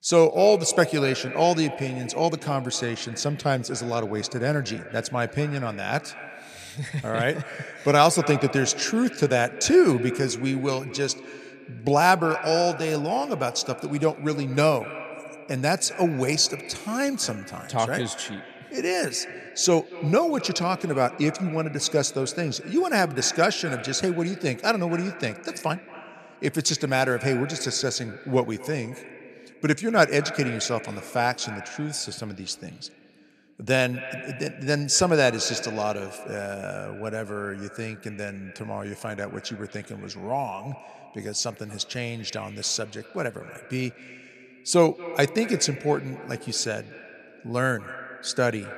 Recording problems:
echo of what is said; noticeable; throughout; 230 ms later, 15 dB below the speech

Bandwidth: 14 kHz